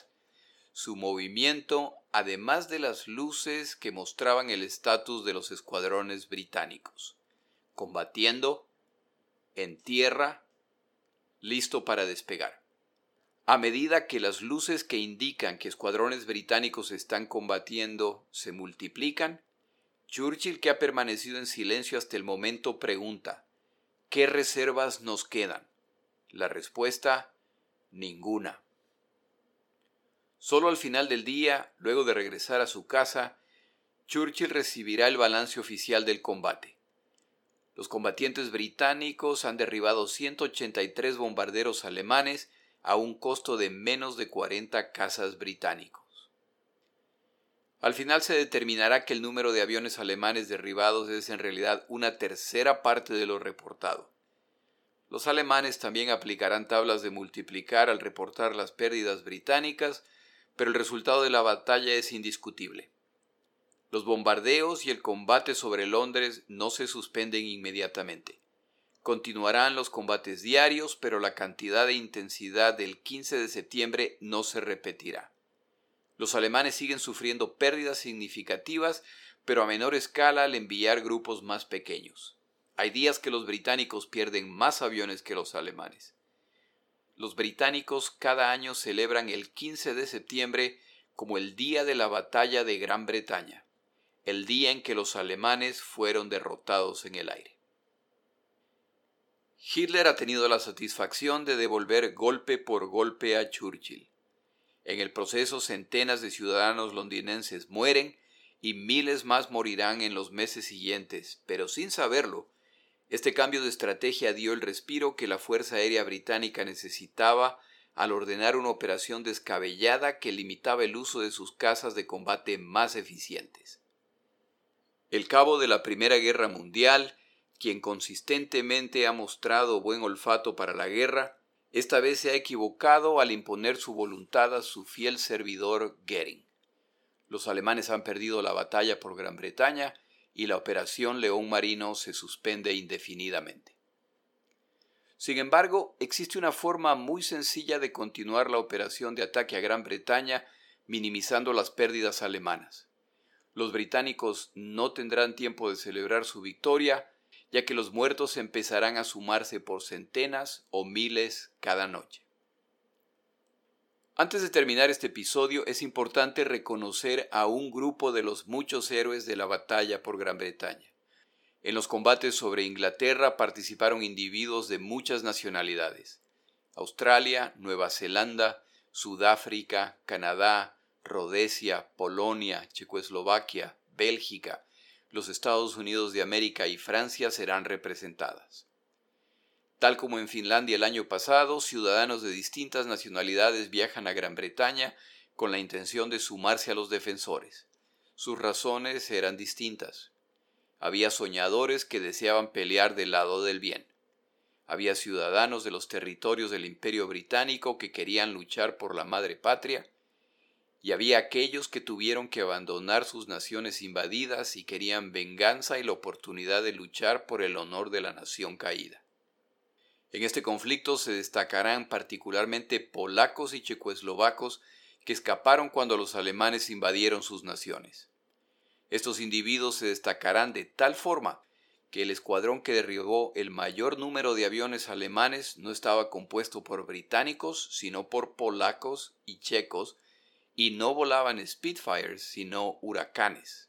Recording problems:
thin; somewhat; fading below 450 Hz

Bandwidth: 17.5 kHz